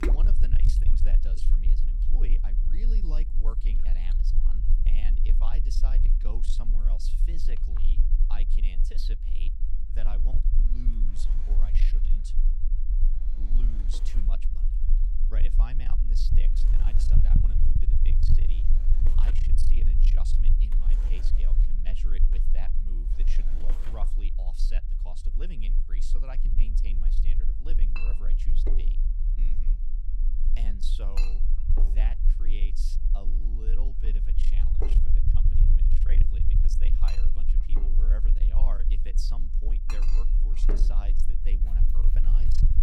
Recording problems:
distortion; slight; 10 dB below the speech
household noises; loud; throughout; 3 dB below the speech
low rumble; loud; throughout; 3 dB below the speech

